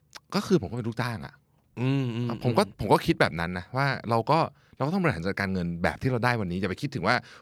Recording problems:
none

